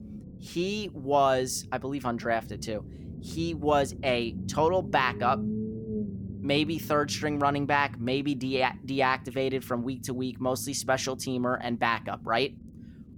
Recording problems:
low rumble; noticeable; throughout; 20 dB below the speech

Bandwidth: 18 kHz